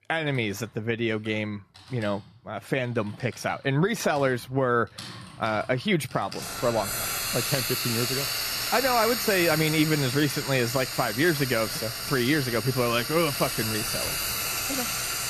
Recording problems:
household noises; loud; throughout; 2 dB below the speech

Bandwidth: 14.5 kHz